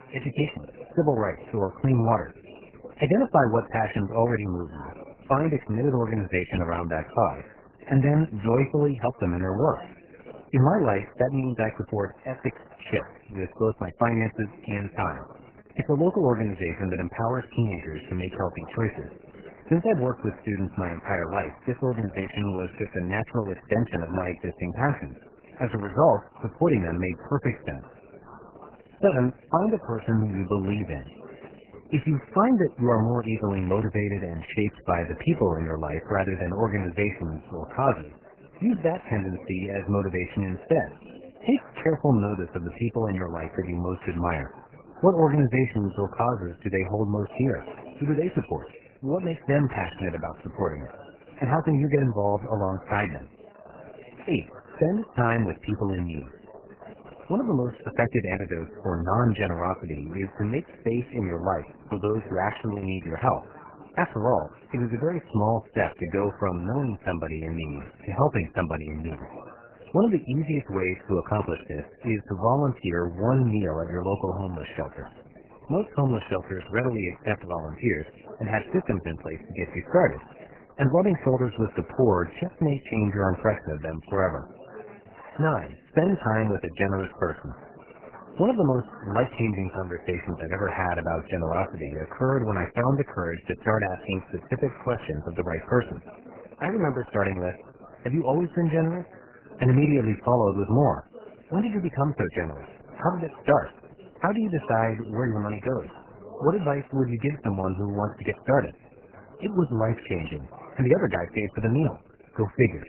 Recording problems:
garbled, watery; badly; nothing above 3 kHz
background chatter; faint; throughout; 4 voices, 20 dB below the speech

